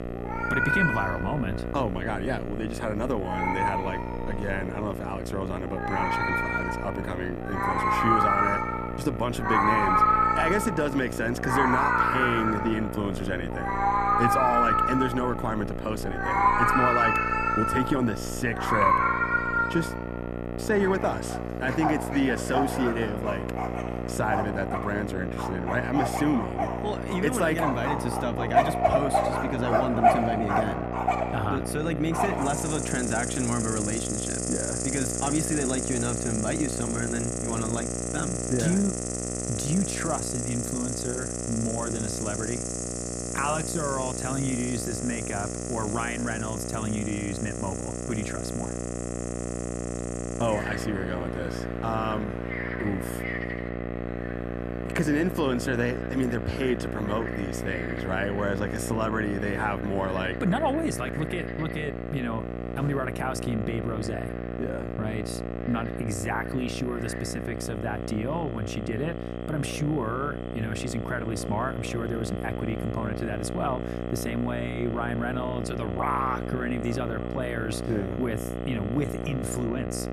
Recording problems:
animal sounds; very loud; throughout; 2 dB above the speech
electrical hum; loud; throughout; 60 Hz, 5 dB below the speech

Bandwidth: 13.5 kHz